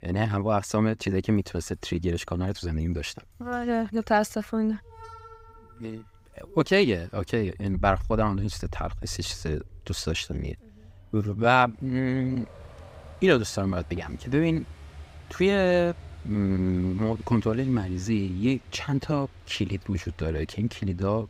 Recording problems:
traffic noise; noticeable; throughout; 20 dB below the speech

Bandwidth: 15.5 kHz